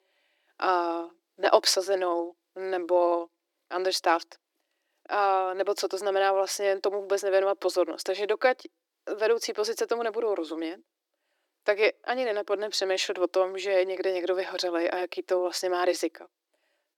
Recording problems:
thin; very; fading below 300 Hz

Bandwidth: 18 kHz